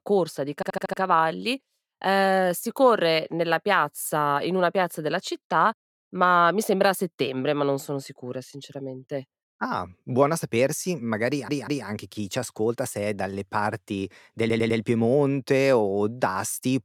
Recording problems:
audio stuttering; at 0.5 s, at 11 s and at 14 s

